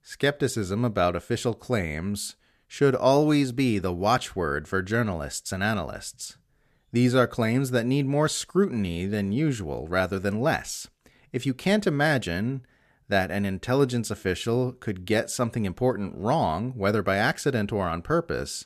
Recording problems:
none

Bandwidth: 14.5 kHz